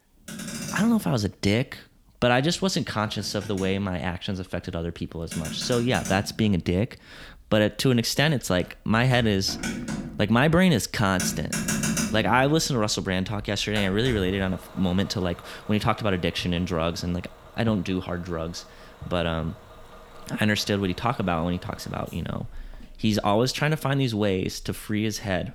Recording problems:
traffic noise; loud; throughout; 10 dB below the speech

